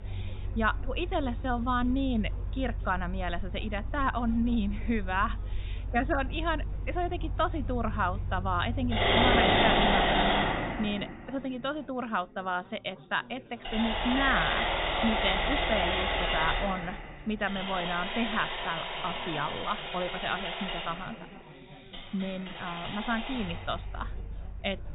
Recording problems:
high frequencies cut off; severe; nothing above 4 kHz
machinery noise; very loud; throughout; 1 dB above the speech
background chatter; noticeable; throughout; 4 voices, 20 dB below the speech

